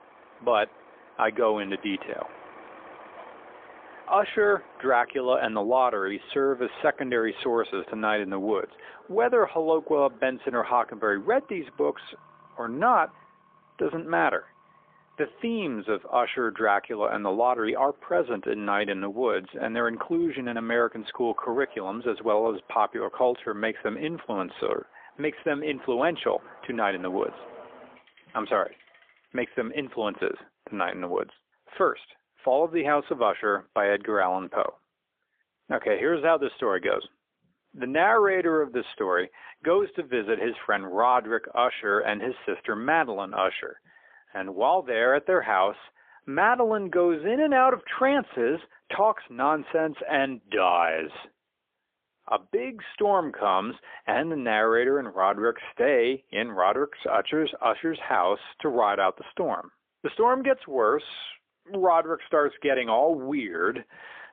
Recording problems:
phone-call audio; poor line; nothing above 3.5 kHz
traffic noise; faint; until 29 s; 25 dB below the speech

